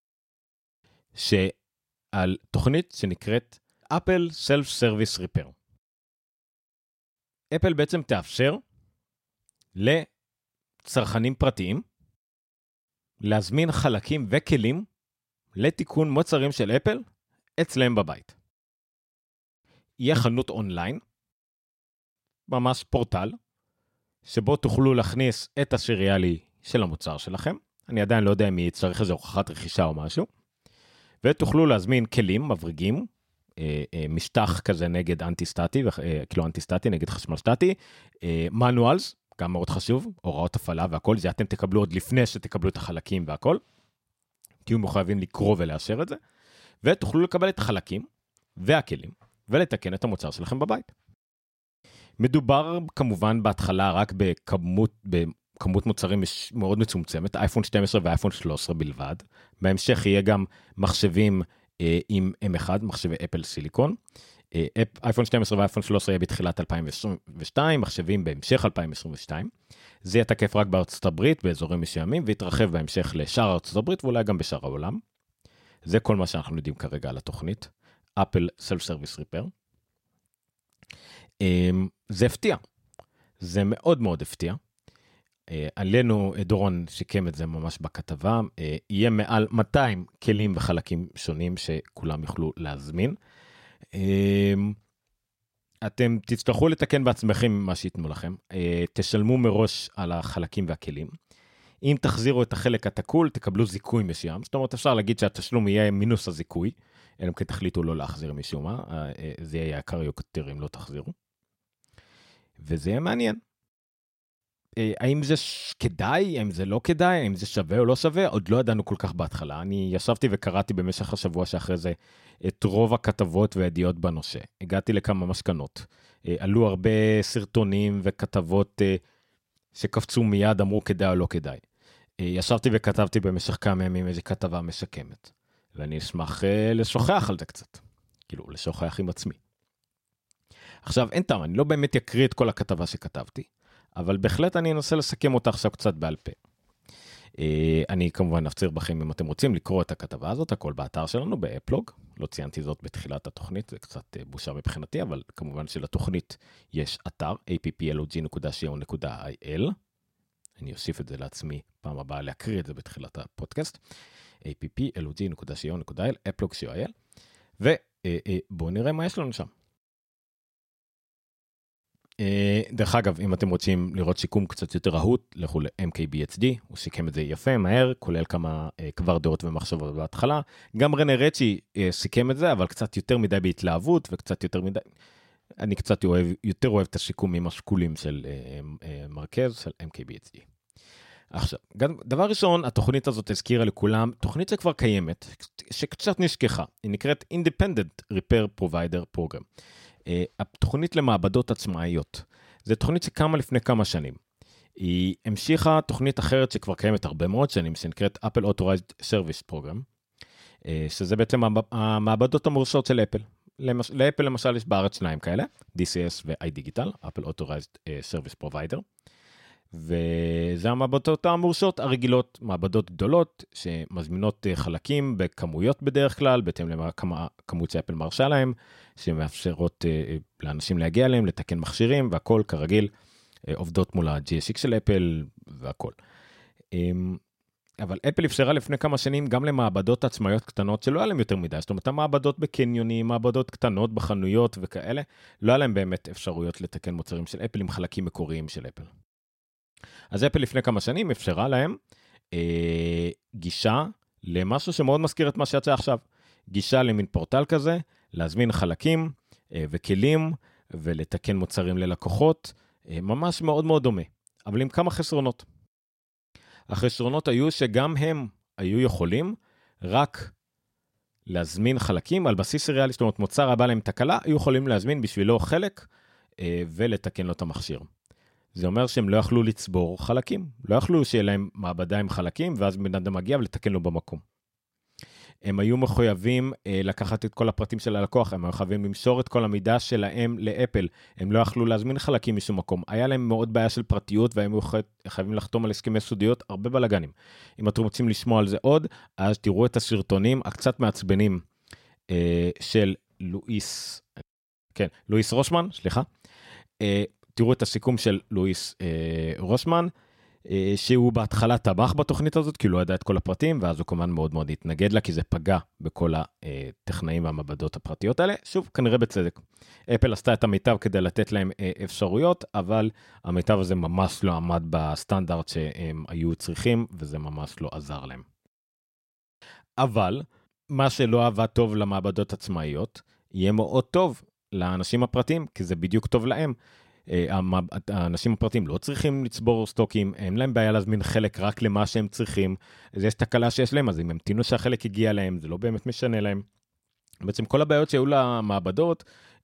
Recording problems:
none

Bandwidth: 16 kHz